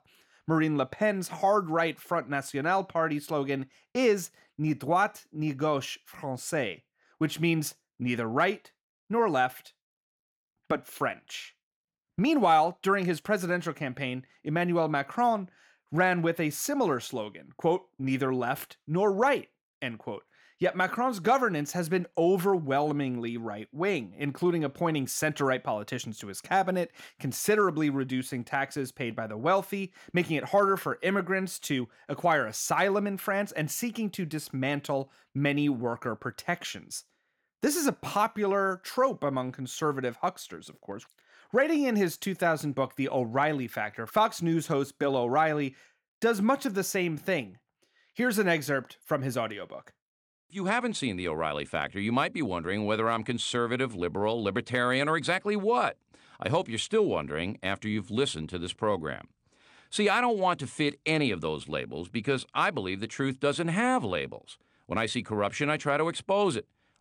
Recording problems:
none

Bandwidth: 17 kHz